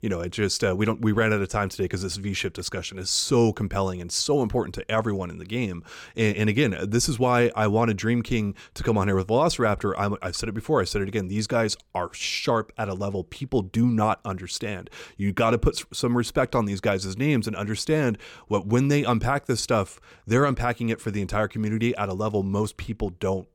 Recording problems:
none

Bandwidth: 17.5 kHz